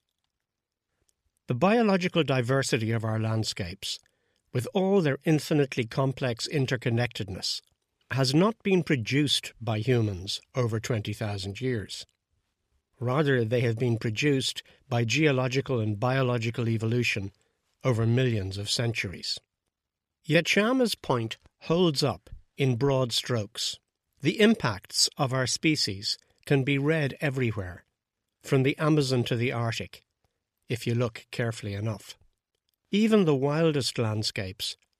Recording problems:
none

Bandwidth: 14 kHz